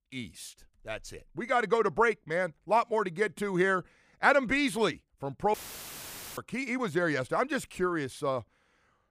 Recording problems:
audio cutting out; filled with static; at 5.5 s for 1 s

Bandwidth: 15 kHz